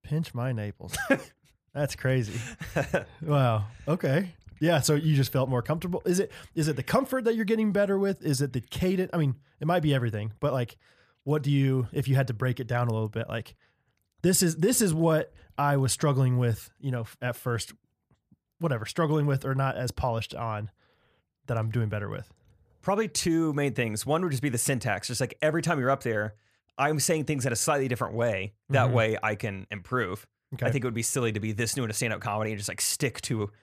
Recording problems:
none

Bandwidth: 14.5 kHz